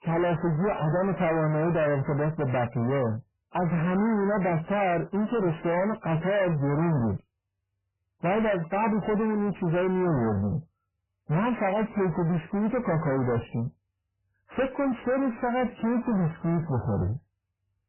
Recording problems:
distortion; heavy; 6 dB below the speech
garbled, watery; badly; nothing above 3 kHz

